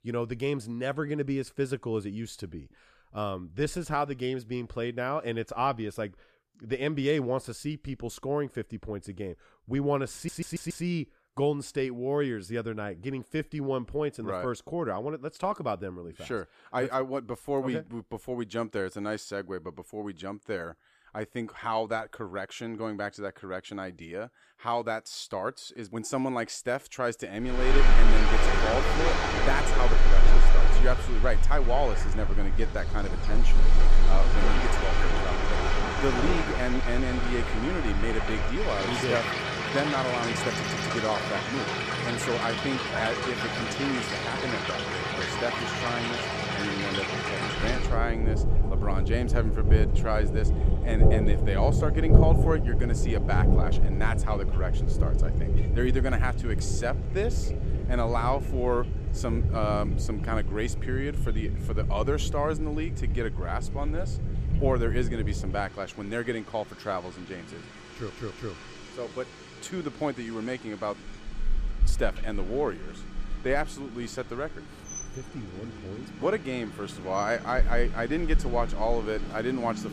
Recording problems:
rain or running water; very loud; from 28 s on; 4 dB above the speech
audio stuttering; at 10 s, at 41 s and at 1:08

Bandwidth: 14.5 kHz